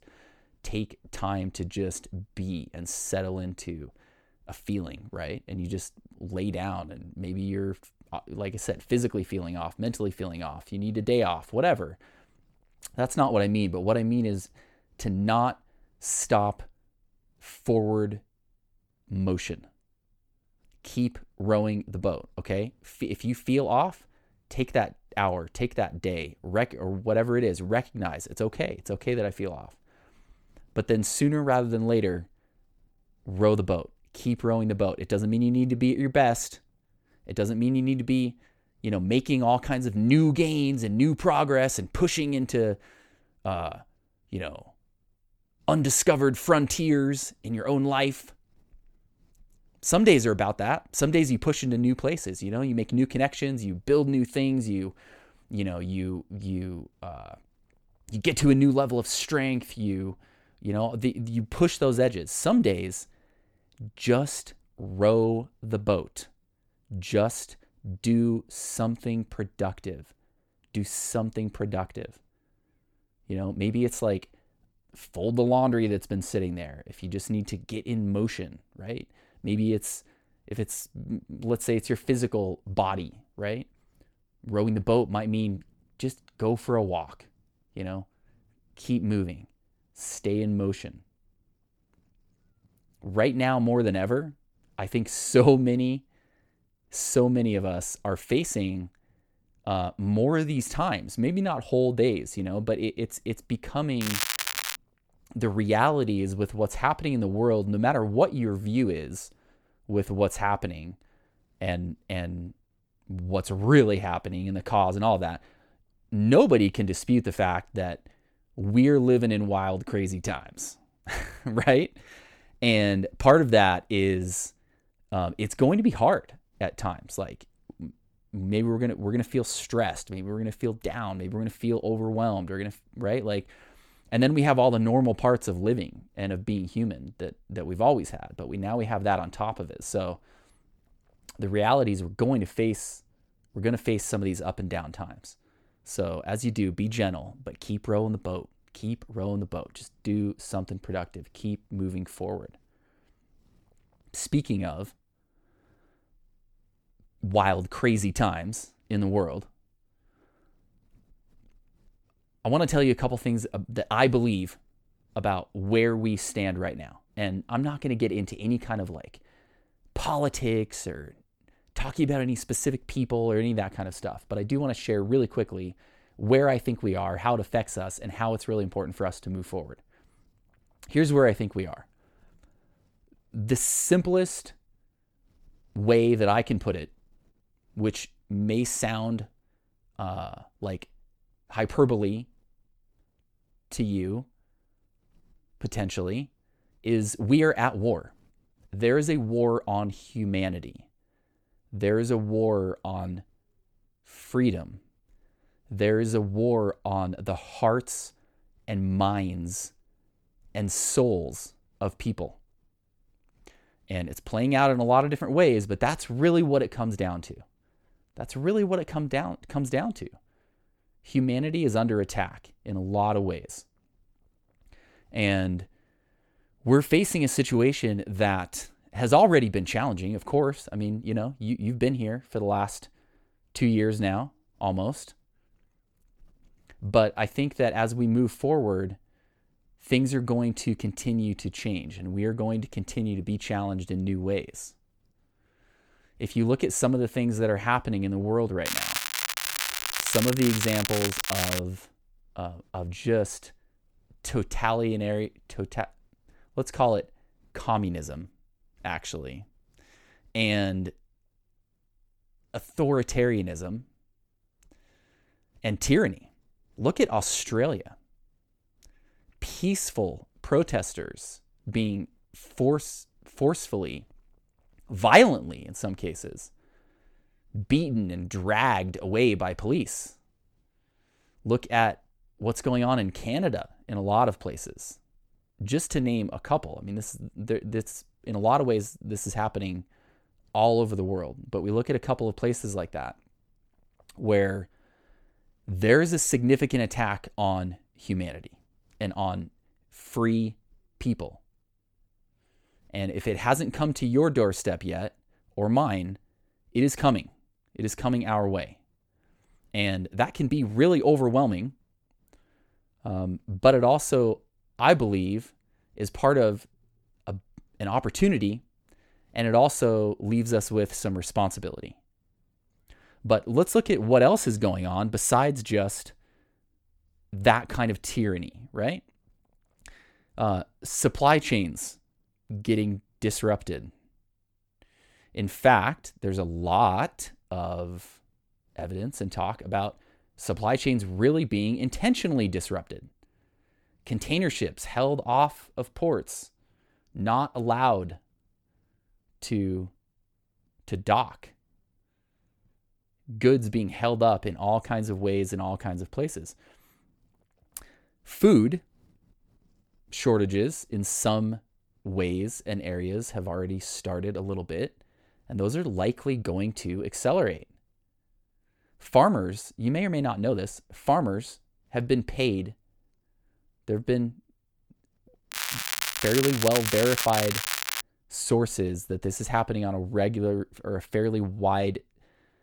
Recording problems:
crackling; loud; at 1:44, from 4:09 to 4:12 and from 6:16 to 6:18; 2 dB below the speech

